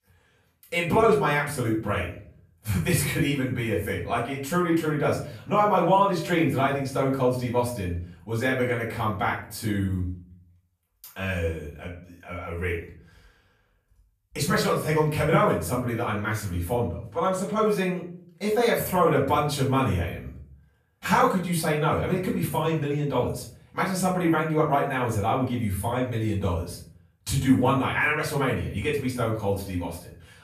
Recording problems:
off-mic speech; far
room echo; noticeable; dies away in 0.5 s

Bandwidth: 14.5 kHz